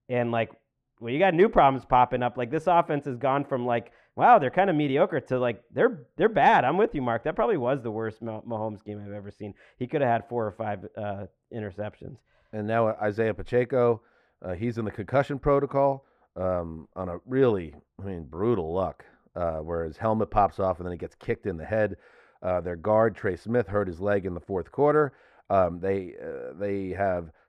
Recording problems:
muffled; very; fading above 2.5 kHz

